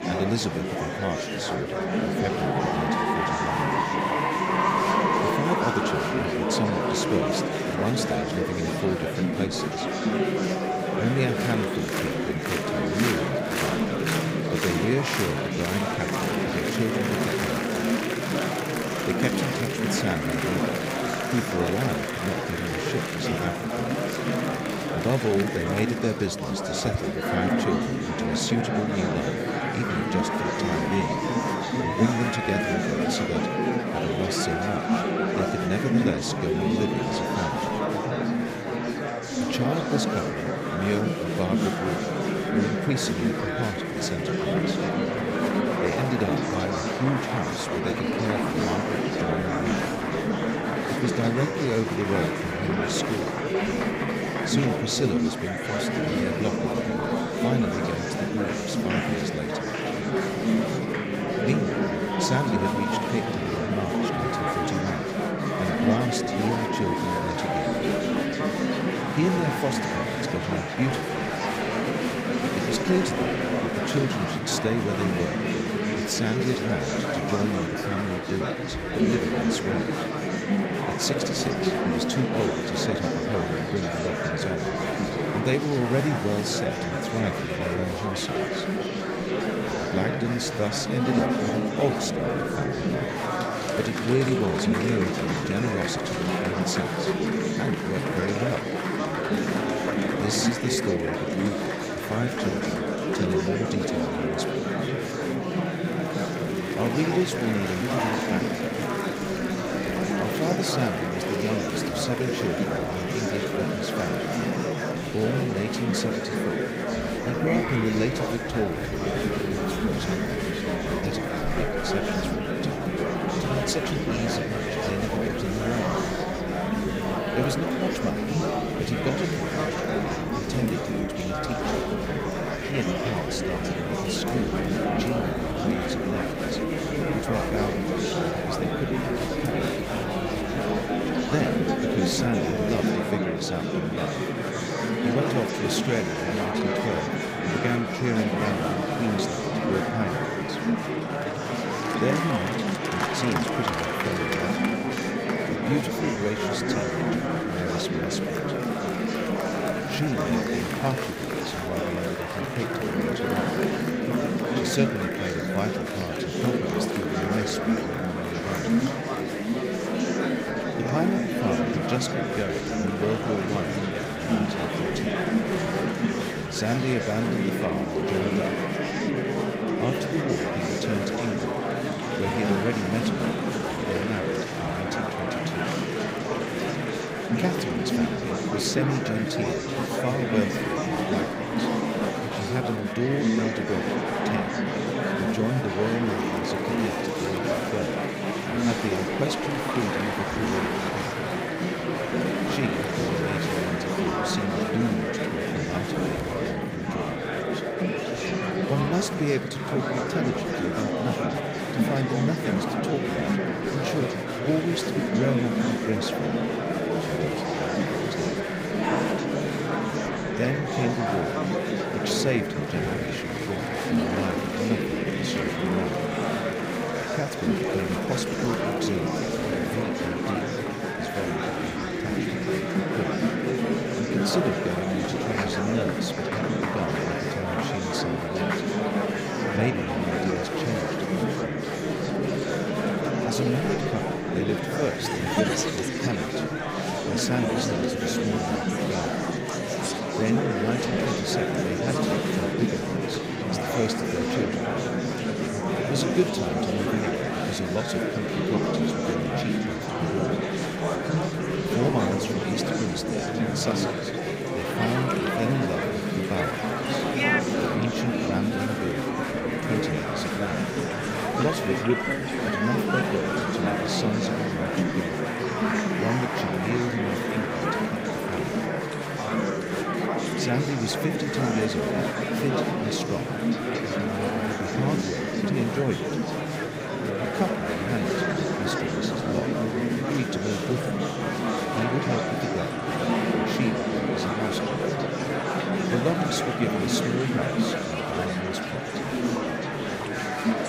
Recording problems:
murmuring crowd; very loud; throughout; 4 dB above the speech
crowd noise; faint; throughout; 20 dB below the speech
crackling; very faint; 4 times, first at 3:16; 20 dB below the speech

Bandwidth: 15.5 kHz